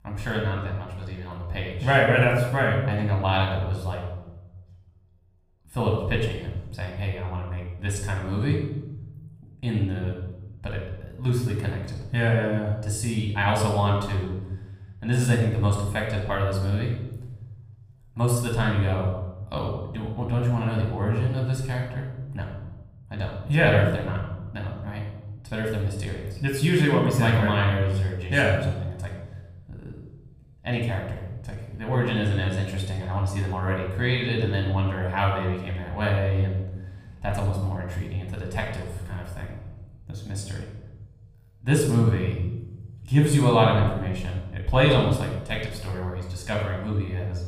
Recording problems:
room echo; noticeable; dies away in 1 s
off-mic speech; somewhat distant

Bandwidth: 15.5 kHz